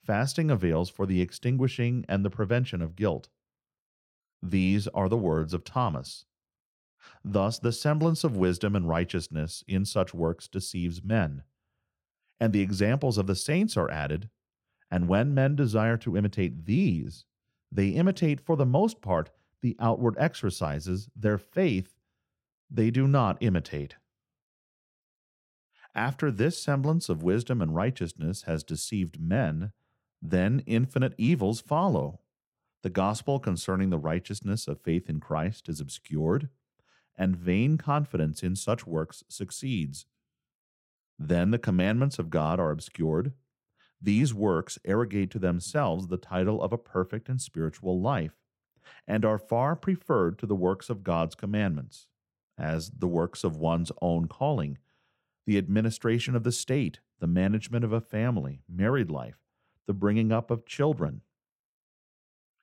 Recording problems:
none

